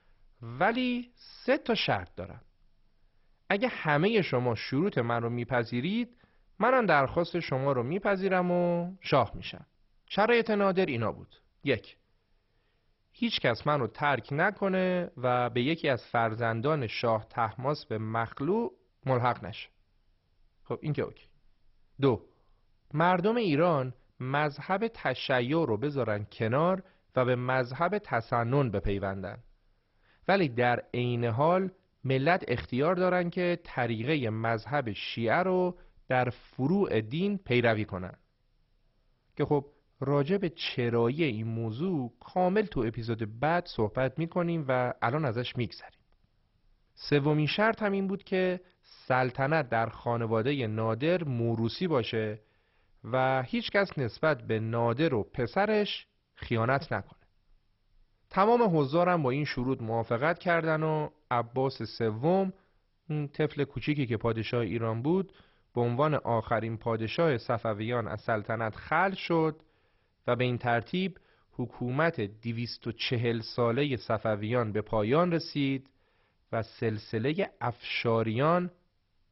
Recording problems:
garbled, watery; badly; nothing above 5.5 kHz

